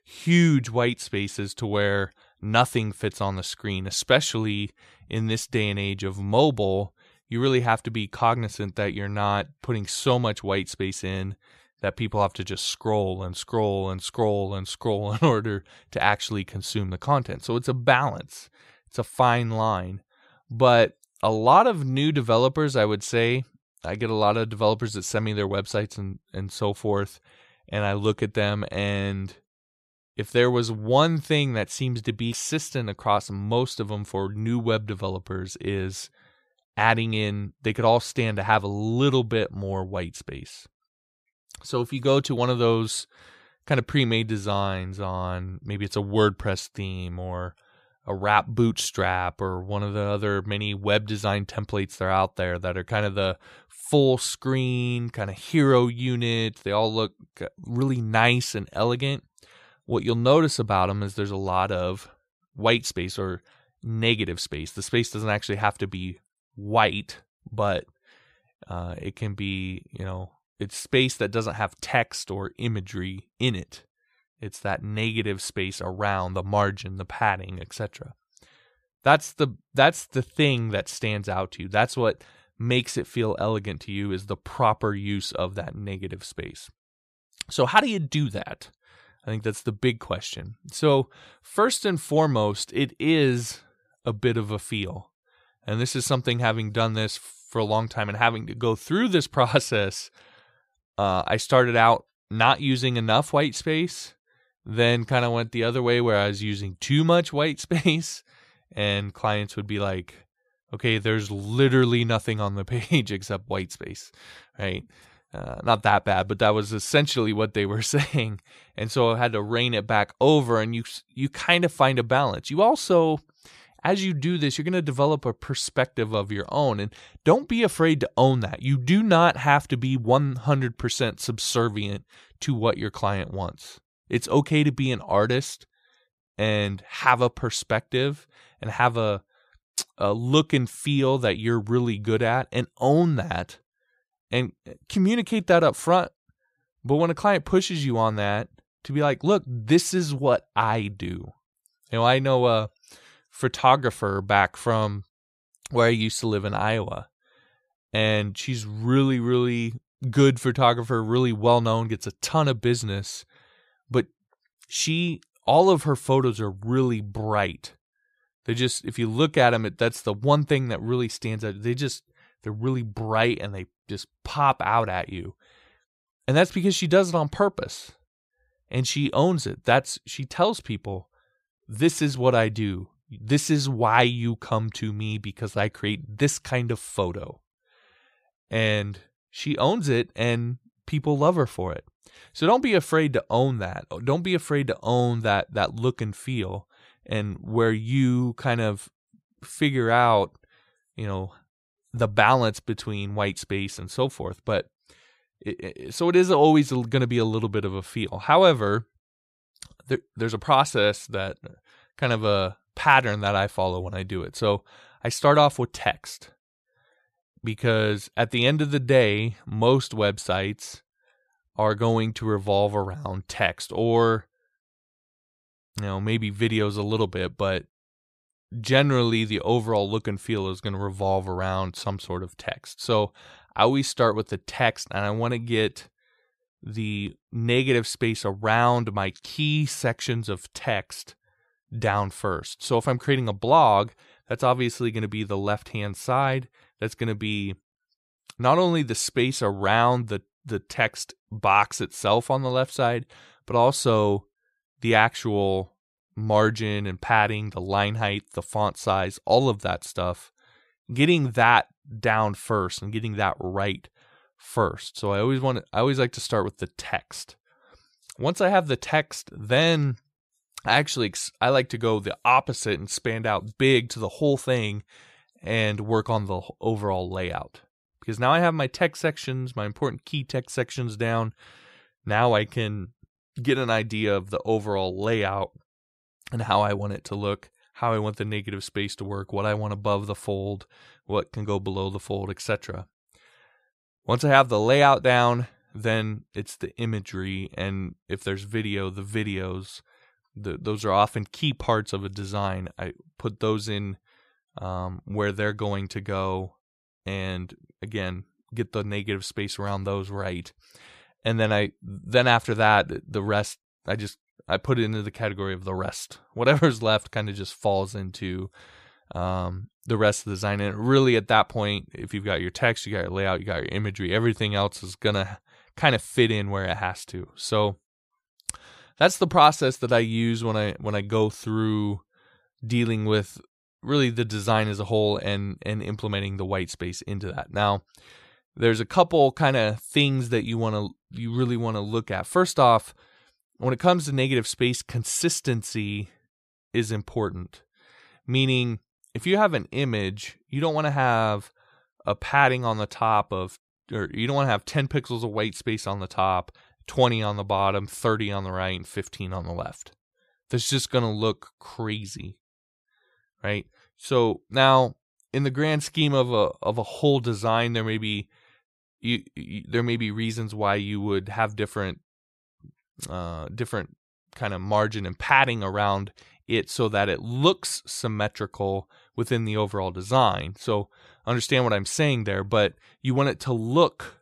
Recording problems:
none

